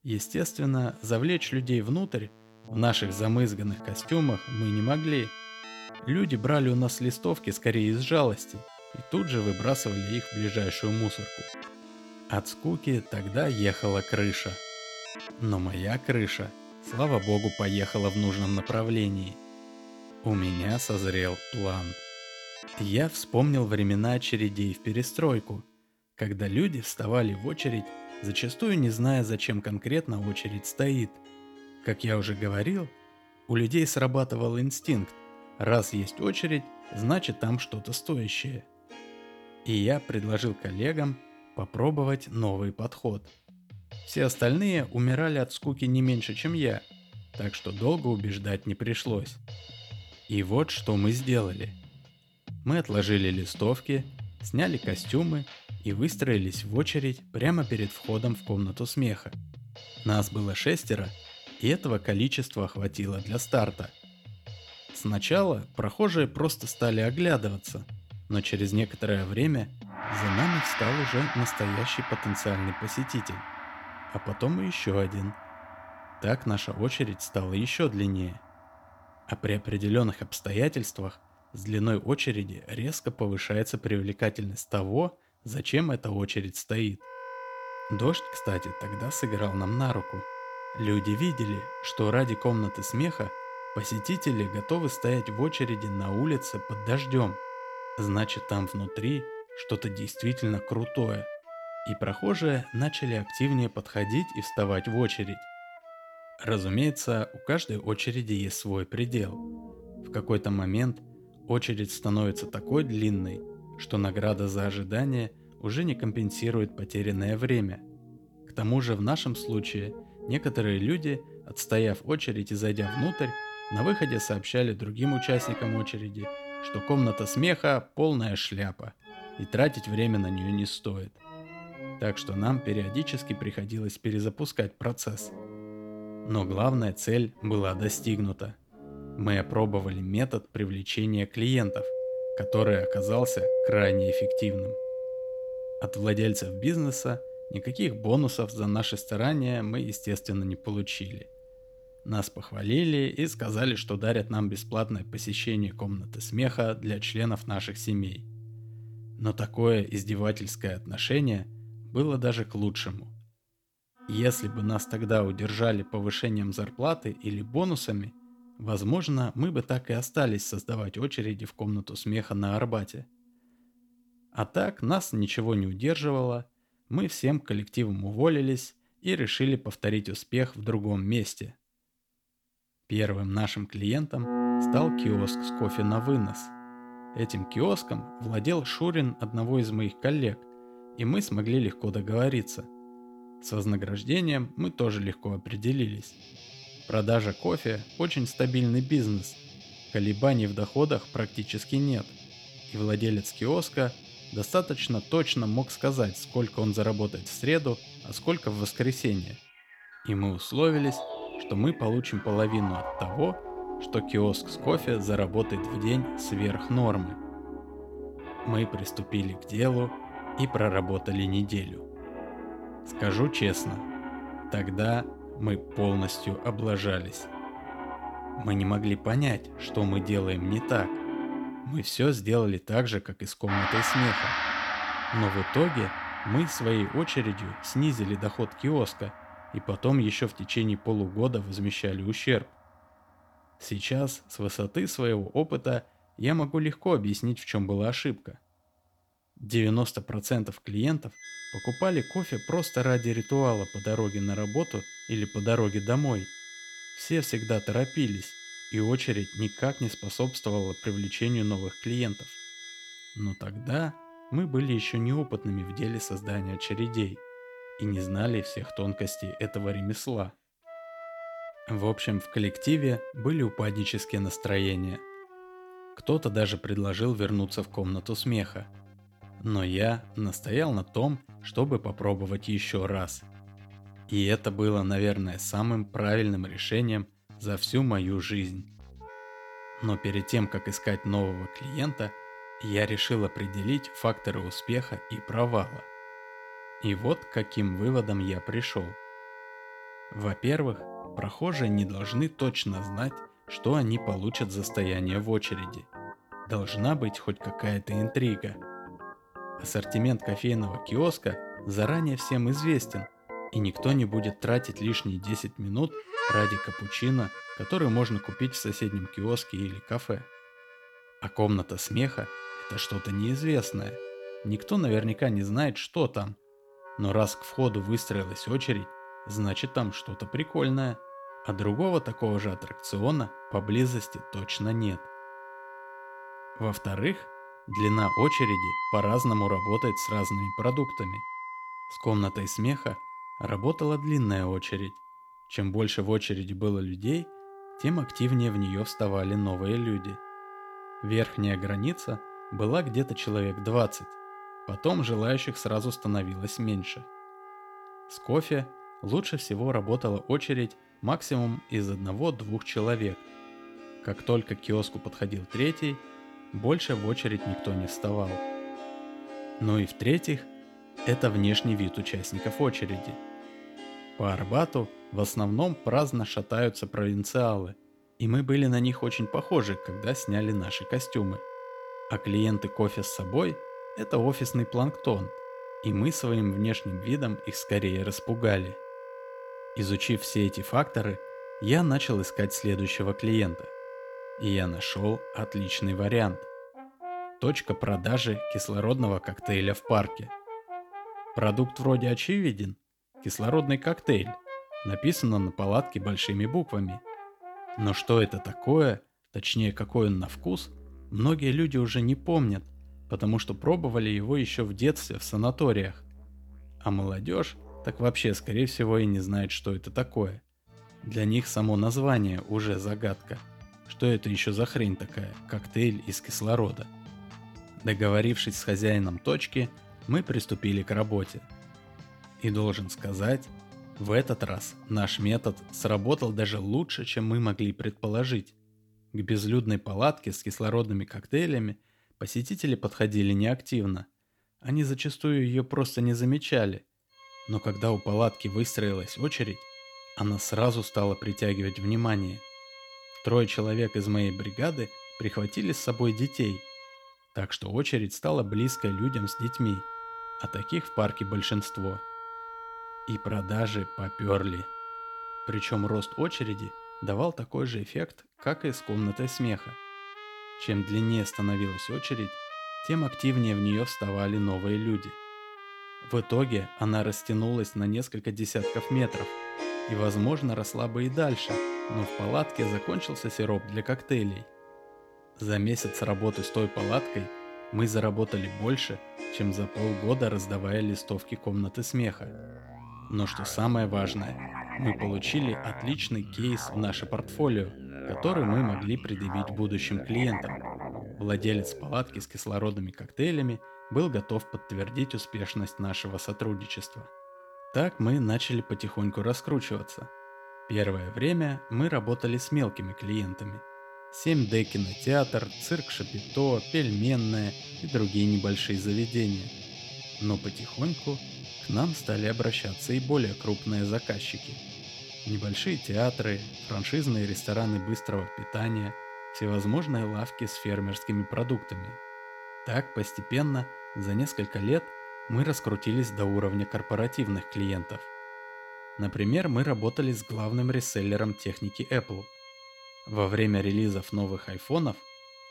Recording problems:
background music; noticeable; throughout; 10 dB below the speech

